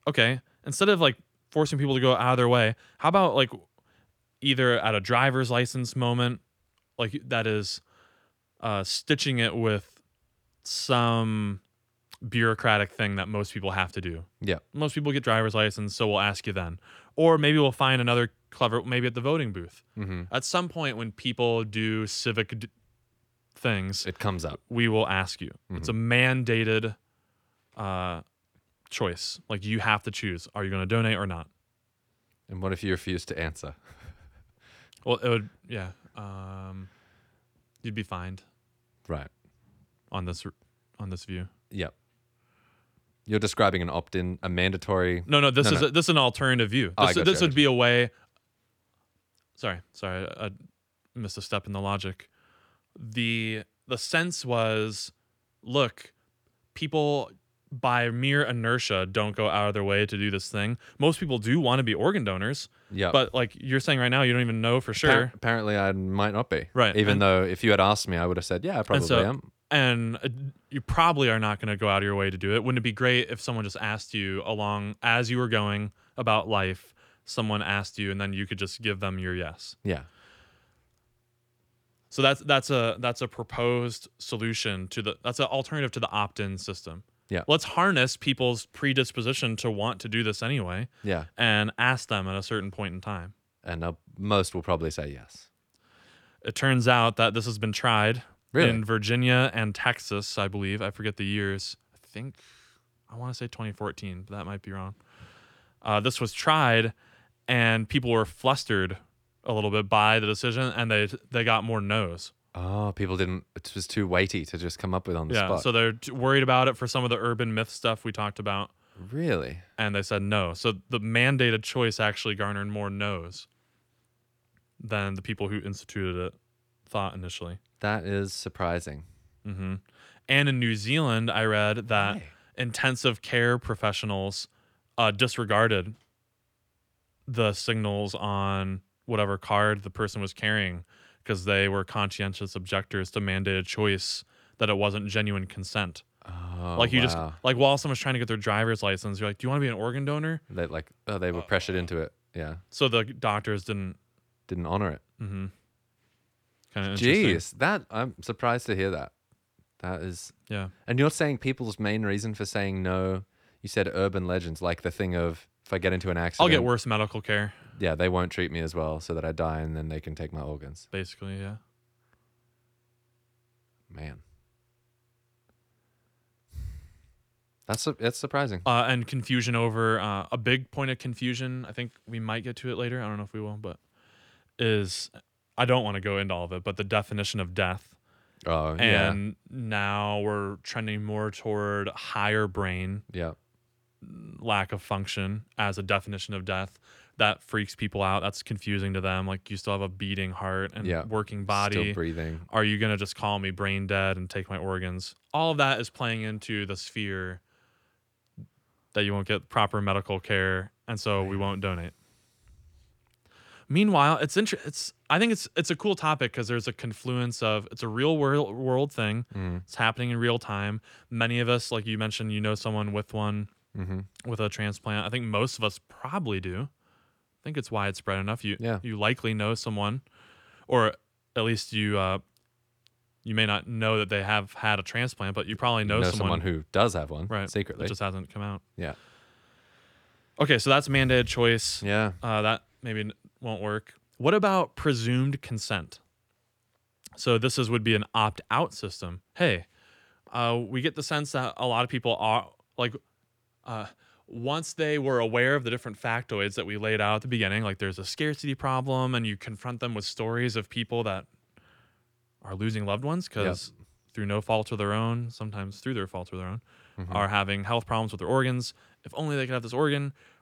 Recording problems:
none

